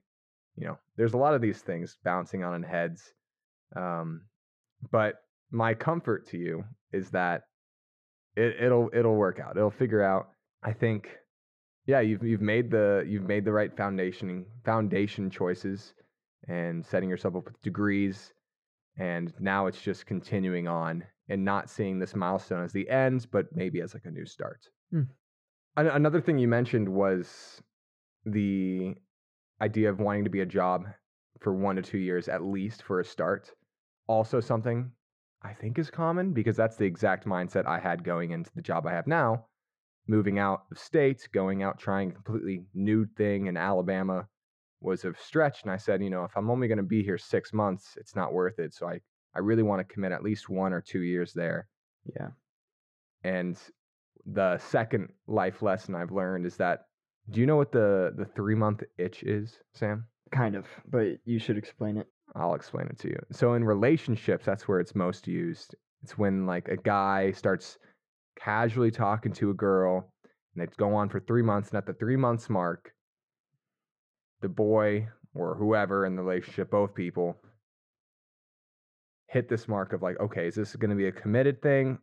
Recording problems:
muffled; very; fading above 1.5 kHz

